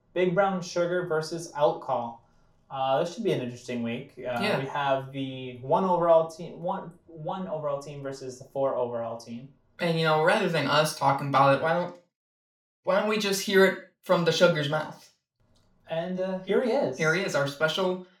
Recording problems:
room echo; slight; dies away in 0.3 s
off-mic speech; somewhat distant

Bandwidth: 17.5 kHz